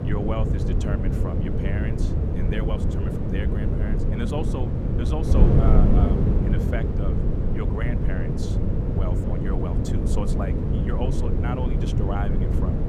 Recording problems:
wind noise on the microphone; heavy; 2 dB above the speech

